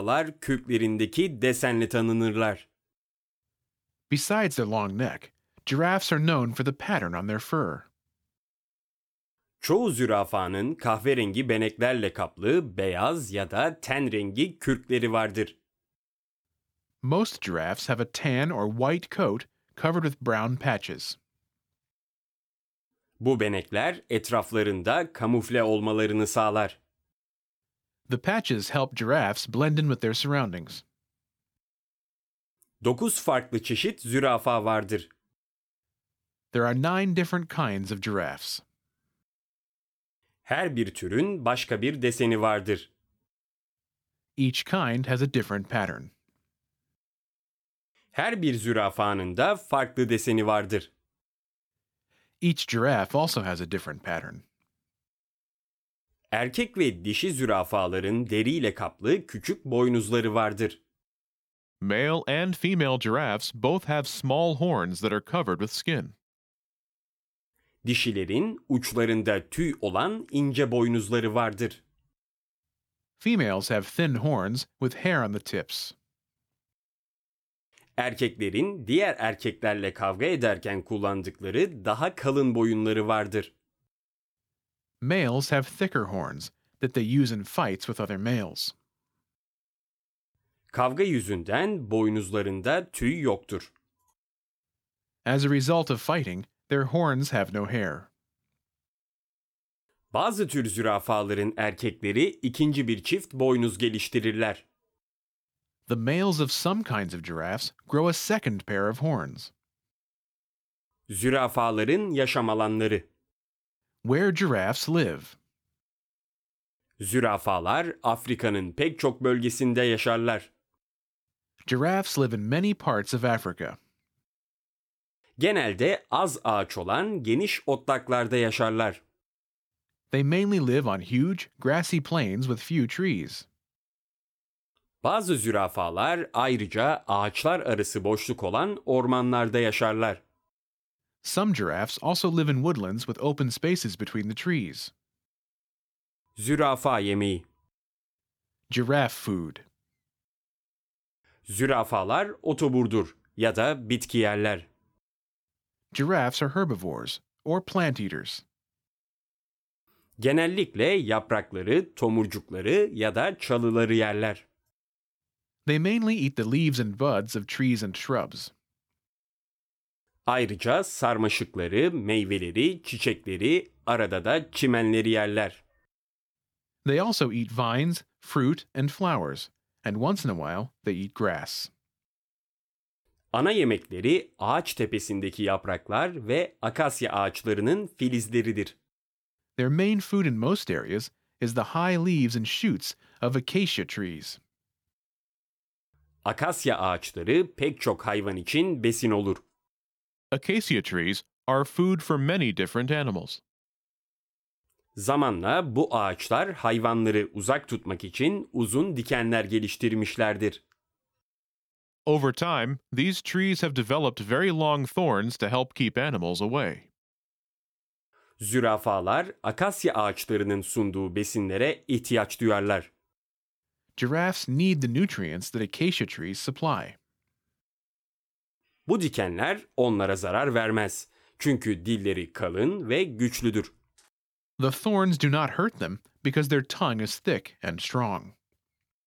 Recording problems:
abrupt cut into speech; at the start

